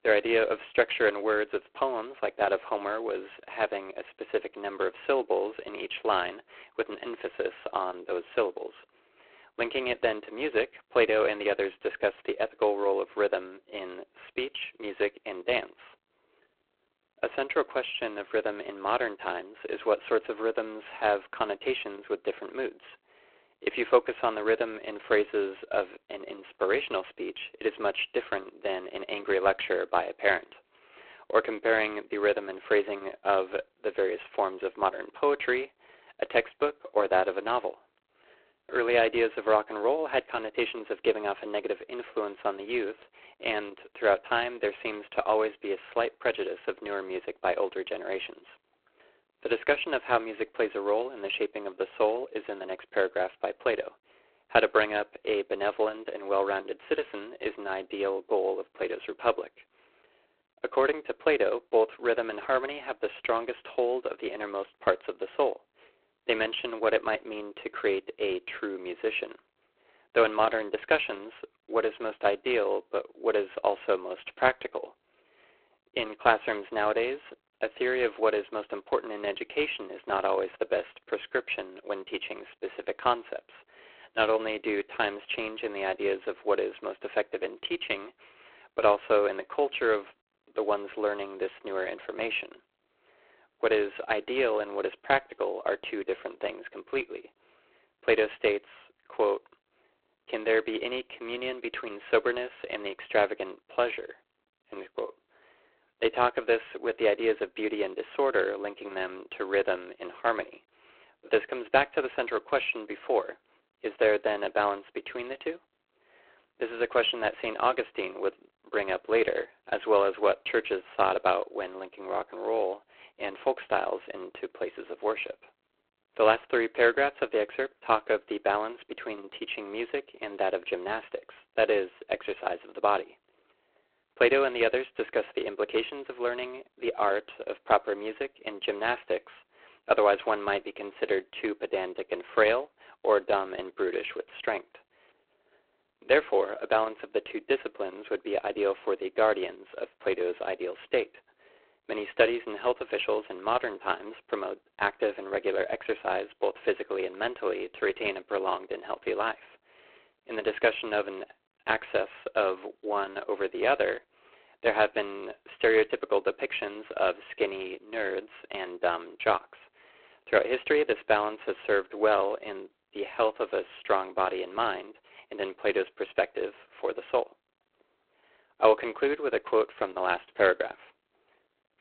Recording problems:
phone-call audio; poor line

